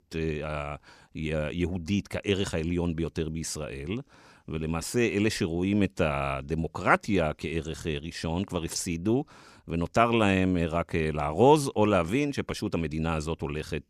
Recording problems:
none

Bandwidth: 15 kHz